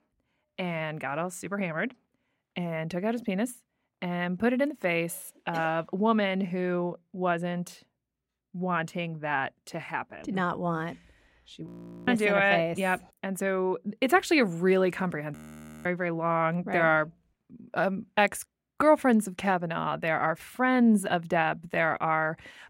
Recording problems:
audio freezing; at 12 s and at 15 s for 0.5 s

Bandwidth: 16 kHz